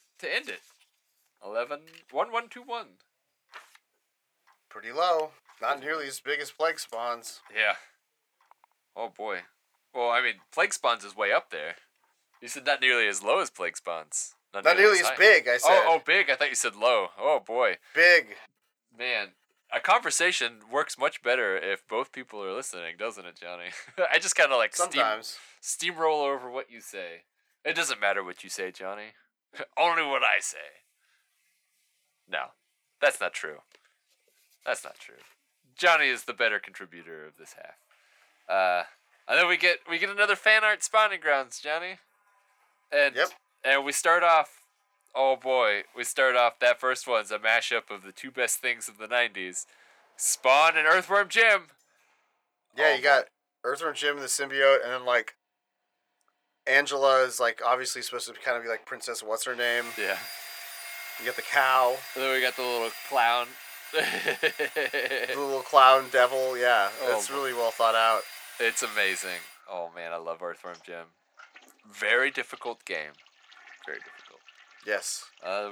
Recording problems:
thin; very; fading below 700 Hz
household noises; noticeable; throughout; 15 dB below the speech
abrupt cut into speech; at the end

